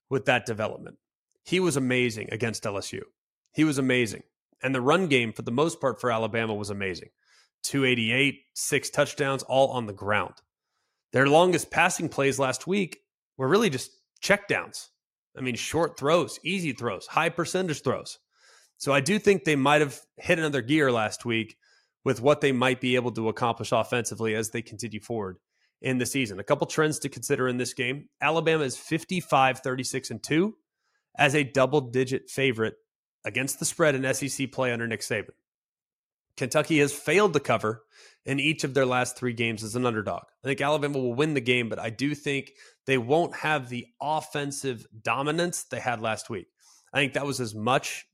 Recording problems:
none

